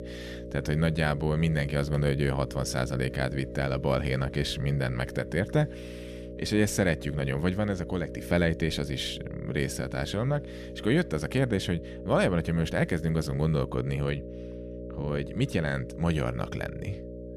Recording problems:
electrical hum; noticeable; throughout; 60 Hz, 10 dB below the speech

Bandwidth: 14.5 kHz